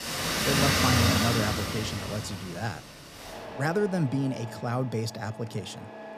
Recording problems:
traffic noise; very loud; throughout; 4 dB above the speech

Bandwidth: 14.5 kHz